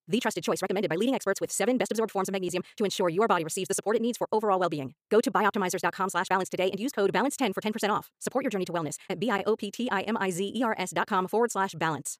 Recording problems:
wrong speed, natural pitch; too fast; 1.7 times normal speed

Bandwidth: 15 kHz